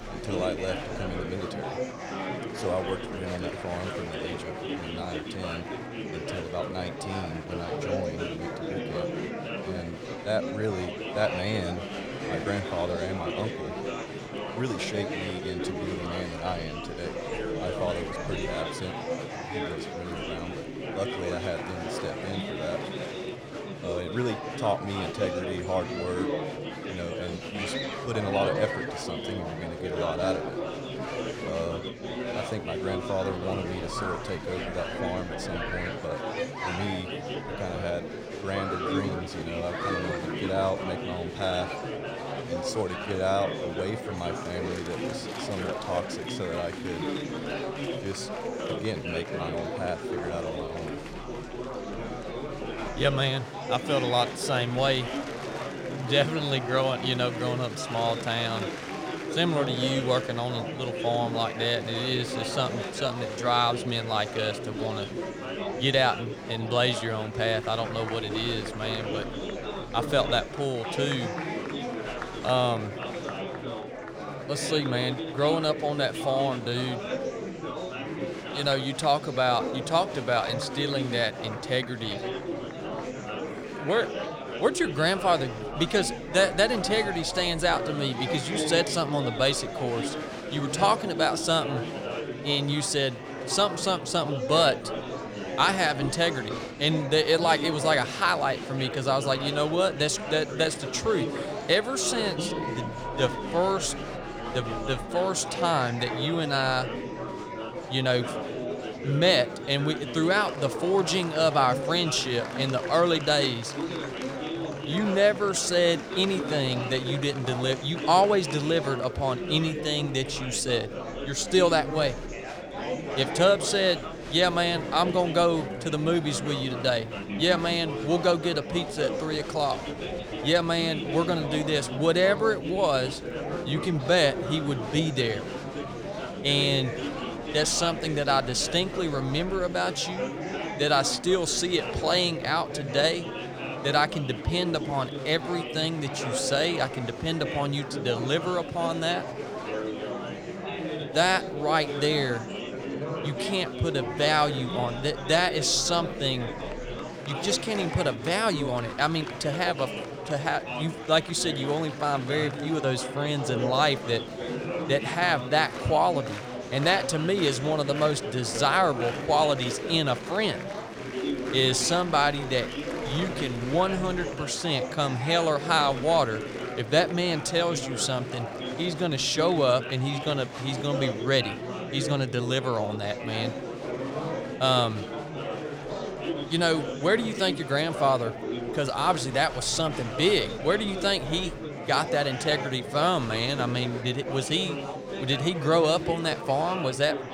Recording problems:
murmuring crowd; loud; throughout; 7 dB below the speech

